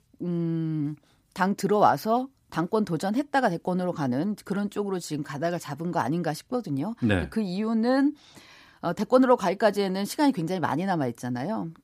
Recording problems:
none

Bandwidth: 15 kHz